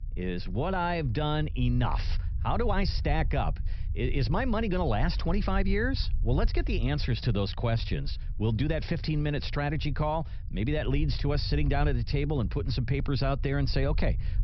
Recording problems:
high frequencies cut off; noticeable; nothing above 5.5 kHz
low rumble; faint; throughout; 20 dB below the speech

